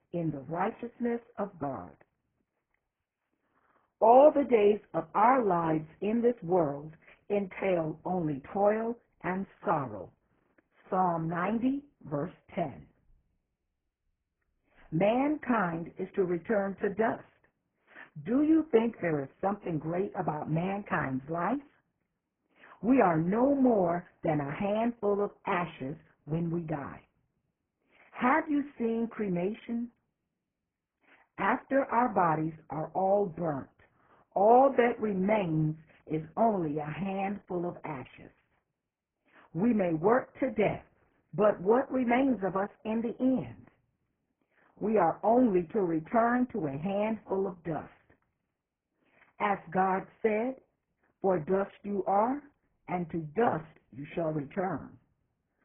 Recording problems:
garbled, watery; badly
high frequencies cut off; severe; nothing above 3 kHz

